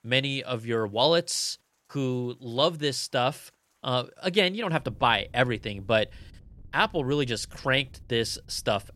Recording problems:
rain or running water; faint; throughout; 25 dB below the speech

